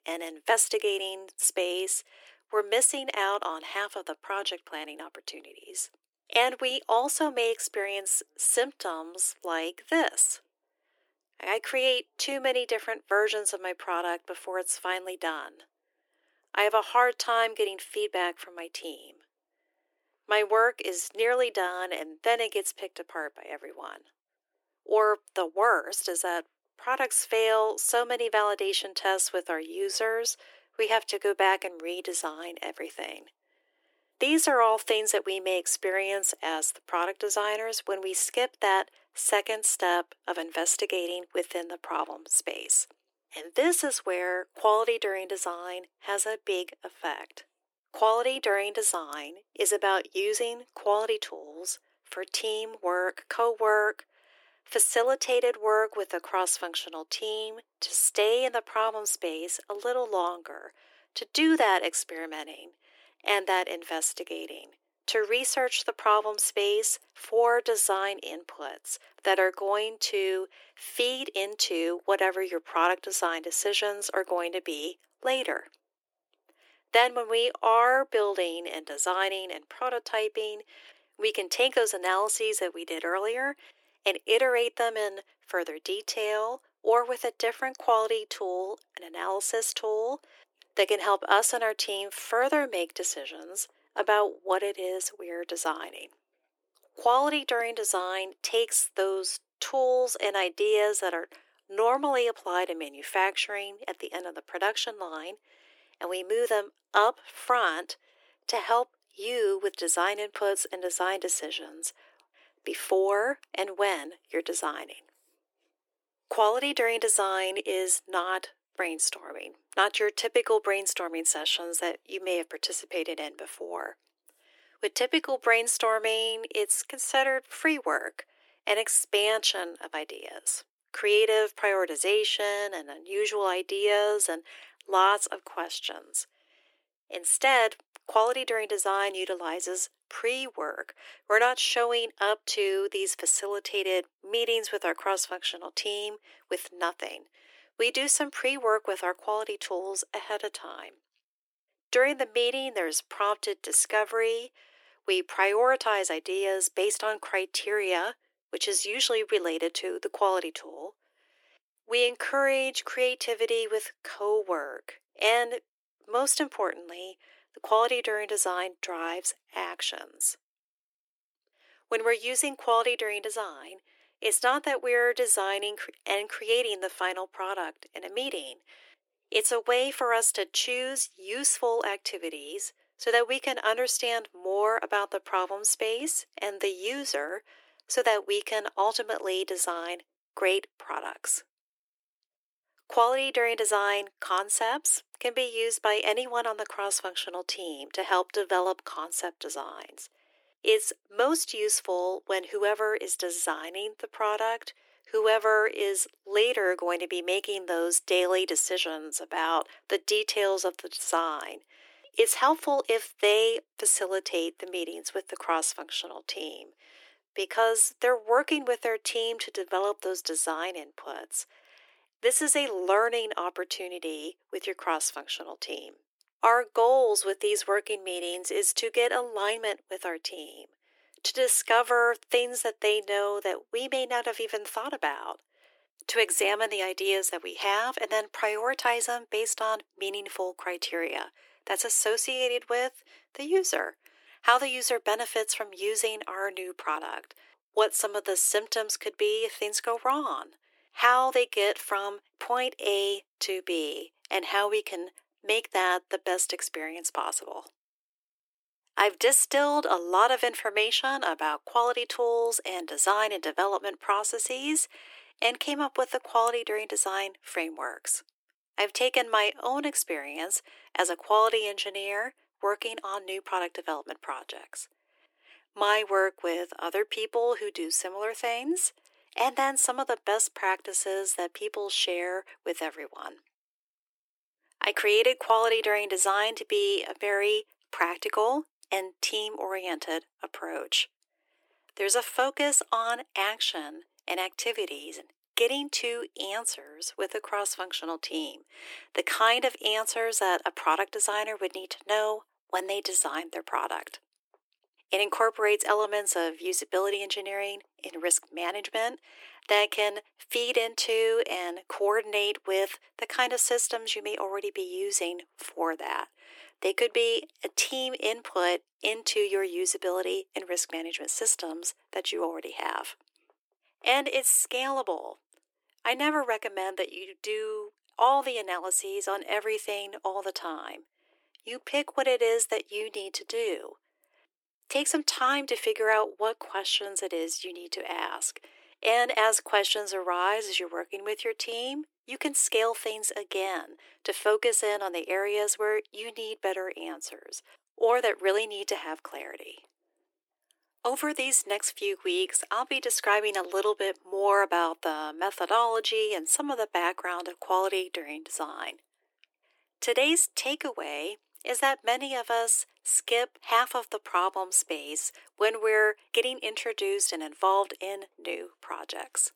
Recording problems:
thin; very; fading below 300 Hz

